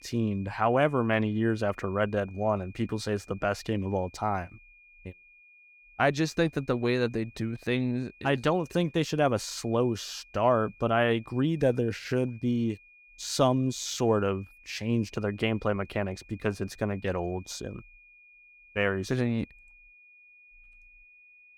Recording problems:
high-pitched whine; faint; throughout; 2.5 kHz, 25 dB below the speech

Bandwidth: 18 kHz